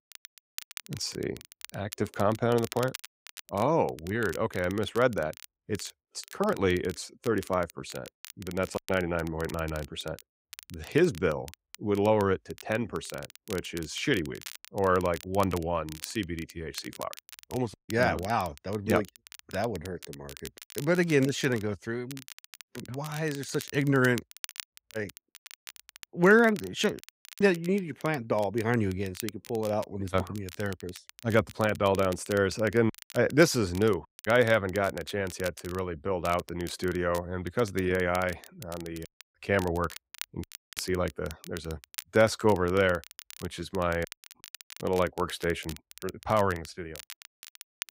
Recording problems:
crackle, like an old record; noticeable; 15 dB below the speech

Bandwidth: 15.5 kHz